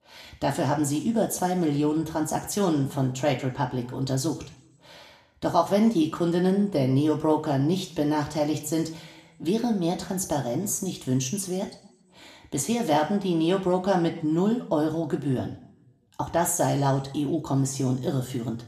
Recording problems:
room echo; slight; dies away in 0.6 s
off-mic speech; somewhat distant

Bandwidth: 14.5 kHz